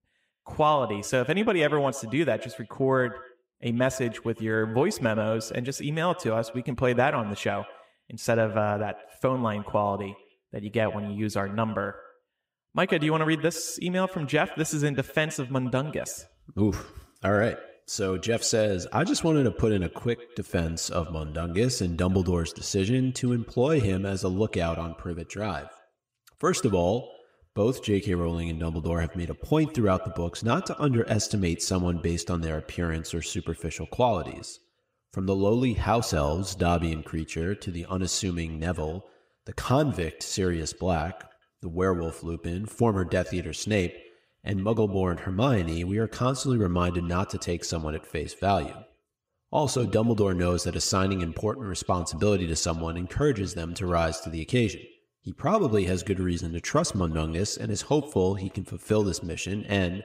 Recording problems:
echo of what is said; noticeable; throughout; 110 ms later, 20 dB below the speech

